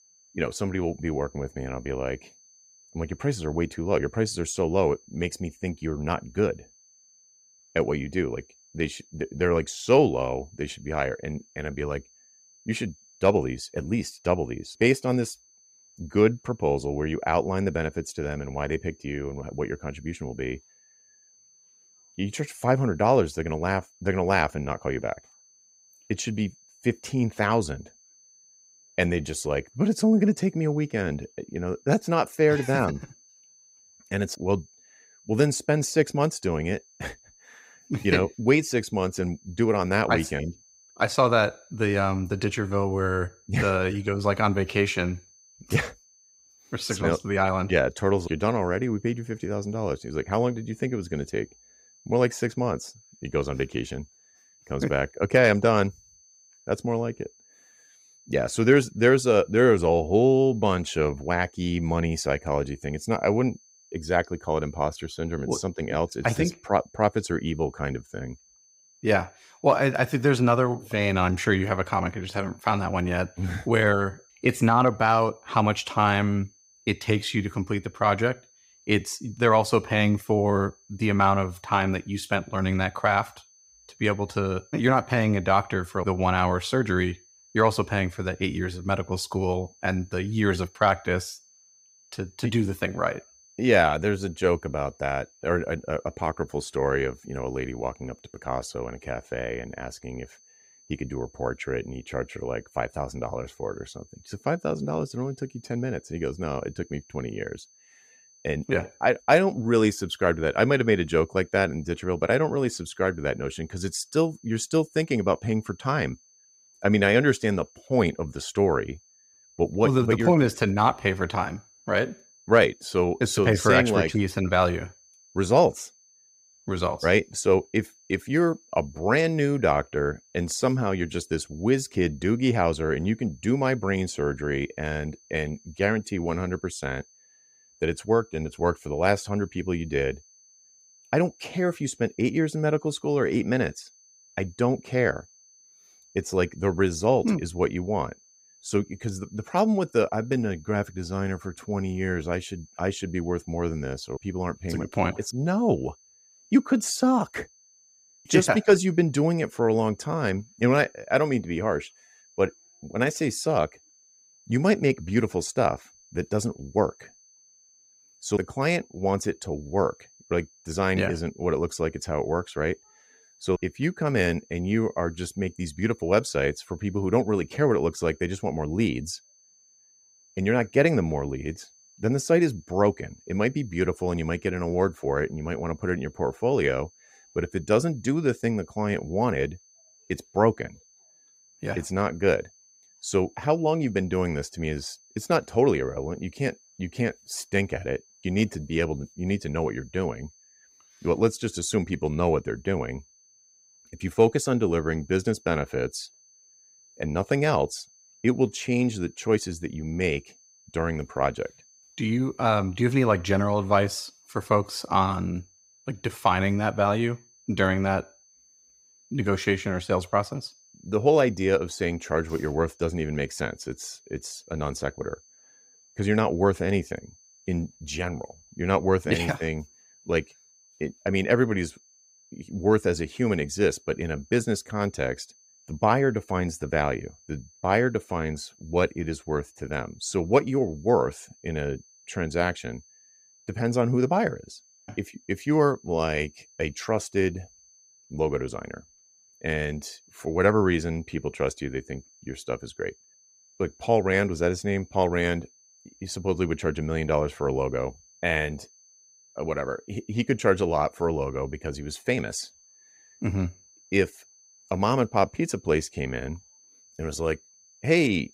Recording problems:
high-pitched whine; faint; throughout; 6 kHz, 30 dB below the speech

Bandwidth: 15.5 kHz